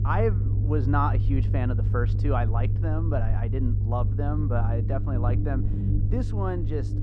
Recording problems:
muffled; slightly; fading above 1.5 kHz
low rumble; loud; throughout; 8 dB below the speech

